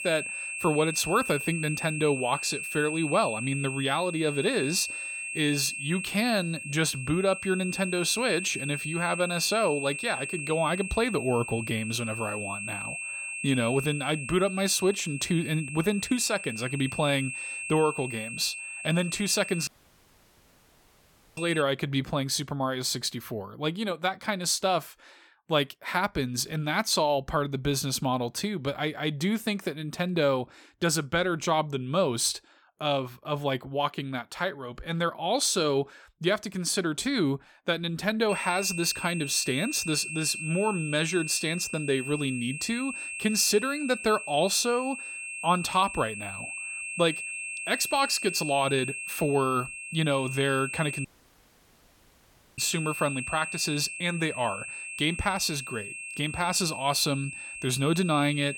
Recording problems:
high-pitched whine; loud; until 22 s and from 38 s on; 2.5 kHz, 7 dB below the speech
audio cutting out; at 20 s for 1.5 s and at 51 s for 1.5 s

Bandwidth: 17 kHz